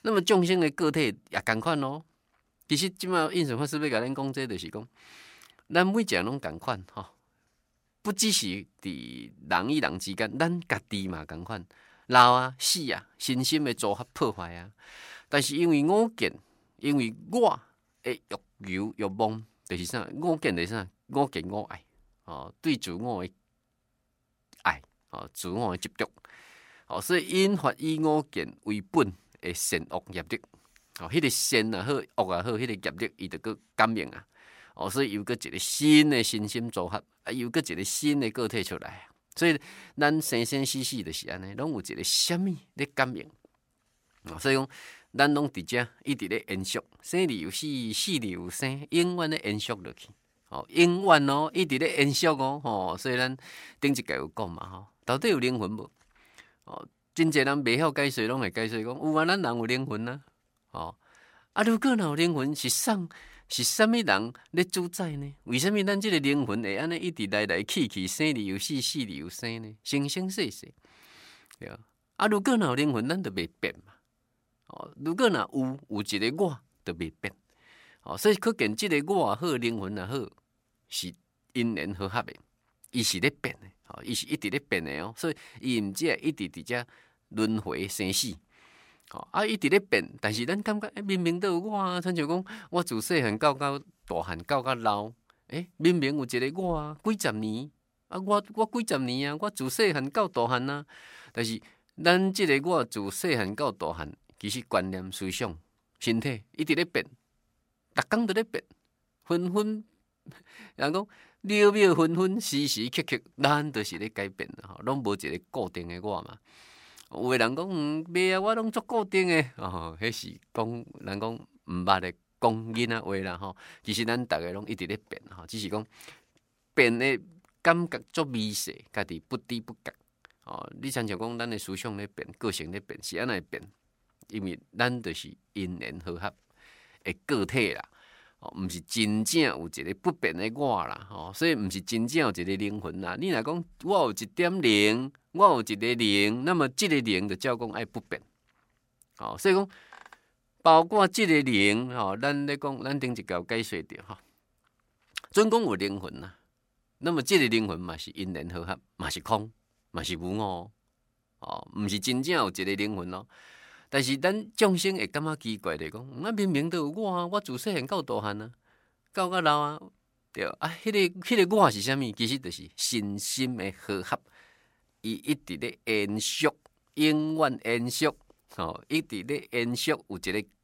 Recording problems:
none

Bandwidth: 16 kHz